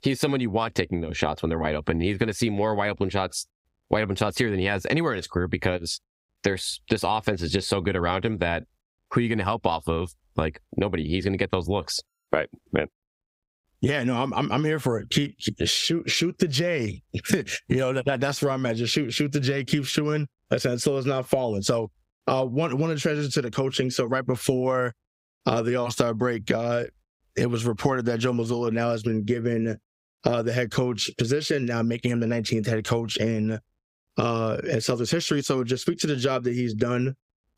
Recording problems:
squashed, flat; somewhat

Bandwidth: 15.5 kHz